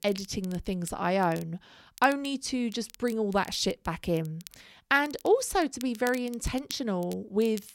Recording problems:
crackle, like an old record; faint; 20 dB below the speech

